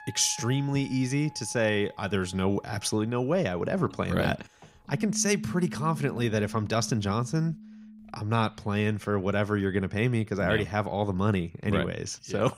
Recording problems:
background music; noticeable; throughout; 15 dB below the speech

